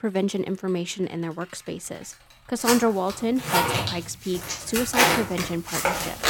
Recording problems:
household noises; very loud; throughout; 3 dB above the speech

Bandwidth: 17 kHz